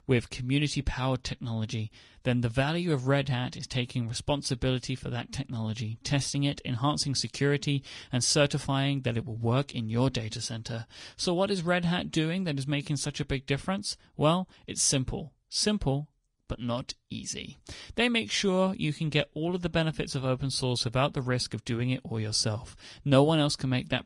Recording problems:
garbled, watery; slightly; nothing above 10 kHz

